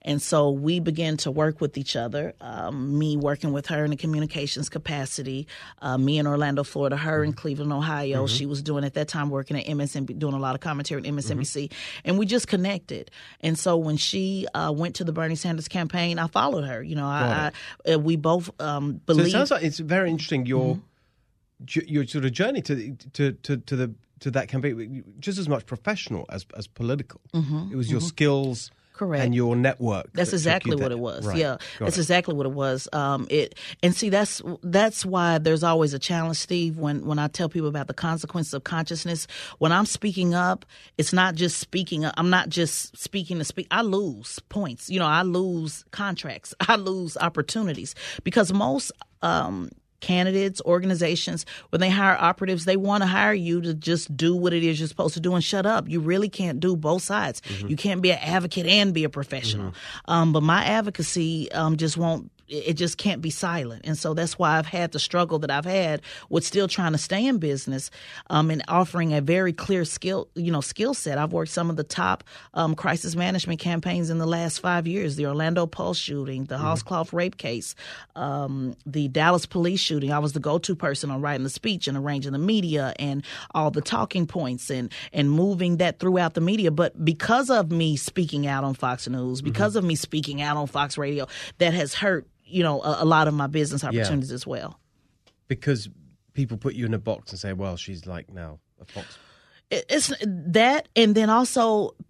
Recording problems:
none

